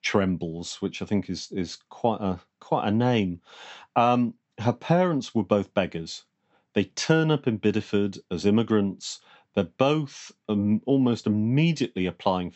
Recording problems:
high frequencies cut off; noticeable; nothing above 8 kHz

